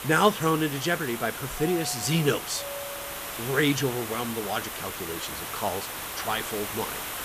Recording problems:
hiss; loud; throughout; 6 dB below the speech
doorbell; faint; from 1.5 to 3.5 s; peak 10 dB below the speech

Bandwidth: 14.5 kHz